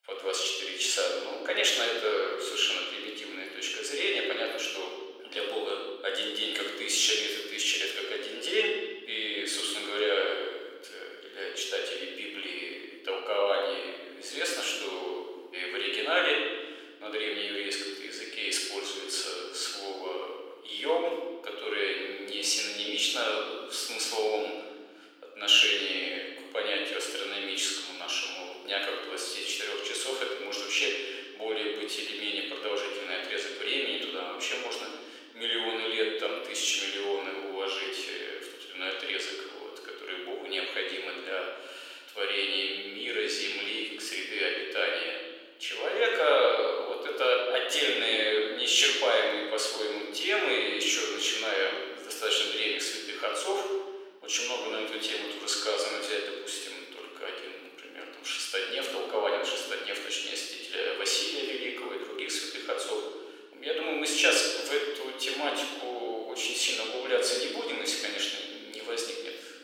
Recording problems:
thin; very; fading below 400 Hz
room echo; noticeable; dies away in 1.4 s
off-mic speech; somewhat distant

